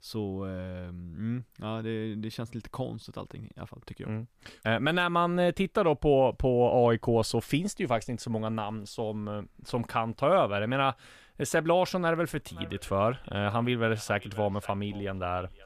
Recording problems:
echo of what is said; faint; from 12 s on; 530 ms later, 20 dB below the speech

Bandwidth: 14.5 kHz